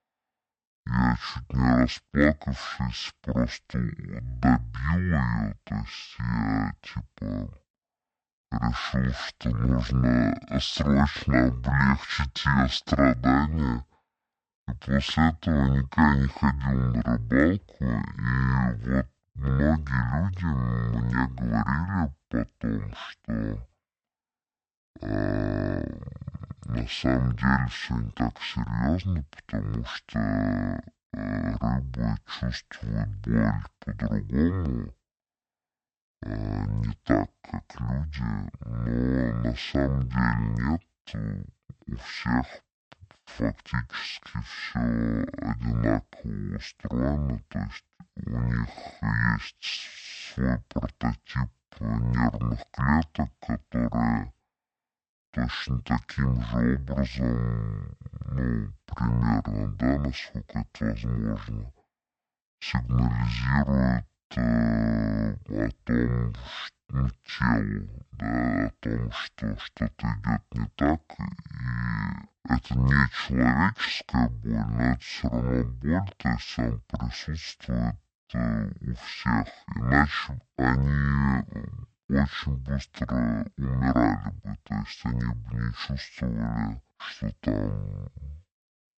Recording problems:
wrong speed and pitch; too slow and too low; 0.5 times normal speed

